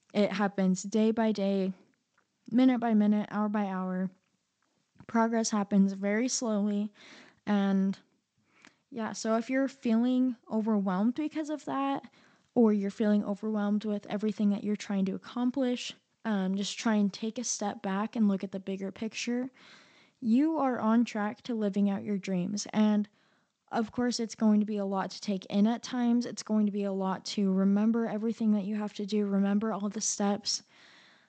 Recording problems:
garbled, watery; slightly; nothing above 7.5 kHz

